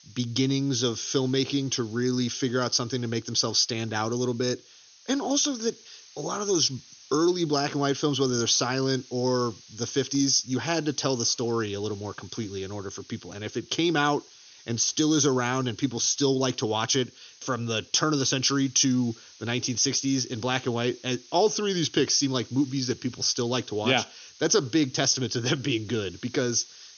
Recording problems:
high frequencies cut off; noticeable; nothing above 6.5 kHz
hiss; faint; throughout; 25 dB below the speech

